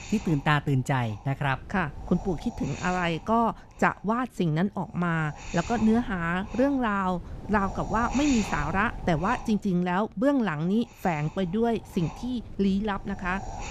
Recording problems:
wind noise on the microphone; occasional gusts; 15 dB below the speech

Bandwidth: 14.5 kHz